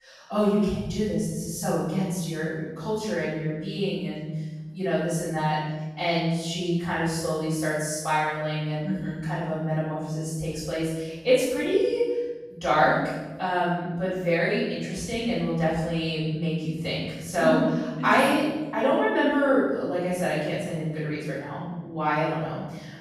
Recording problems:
room echo; strong; dies away in 1.5 s
off-mic speech; far

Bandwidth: 14.5 kHz